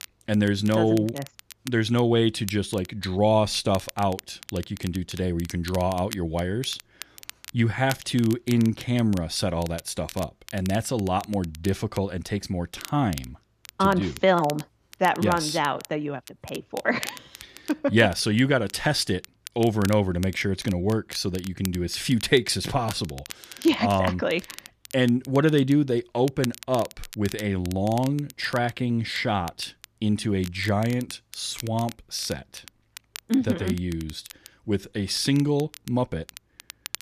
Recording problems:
crackle, like an old record; noticeable; 15 dB below the speech

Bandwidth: 14.5 kHz